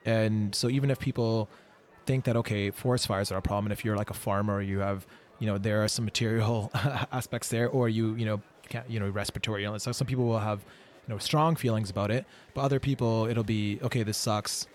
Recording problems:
murmuring crowd; faint; throughout; 25 dB below the speech

